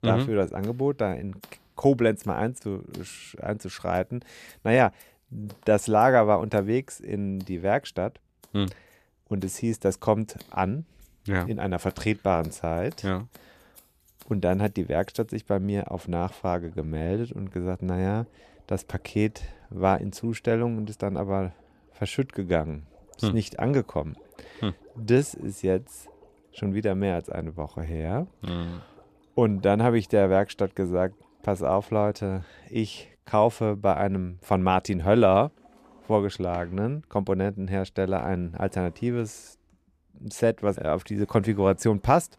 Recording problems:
household noises; faint; throughout; 30 dB below the speech

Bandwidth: 14.5 kHz